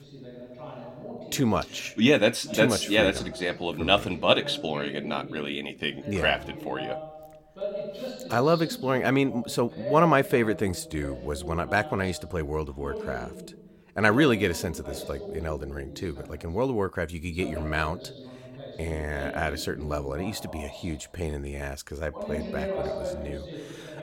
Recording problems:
voice in the background; noticeable; throughout; 10 dB below the speech

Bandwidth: 16.5 kHz